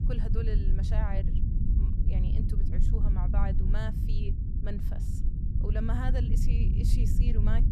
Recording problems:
low rumble; loud; throughout; 2 dB below the speech

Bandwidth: 14 kHz